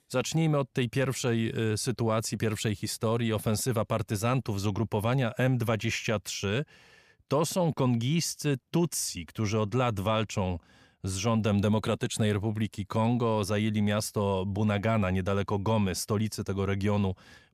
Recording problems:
none

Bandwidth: 14.5 kHz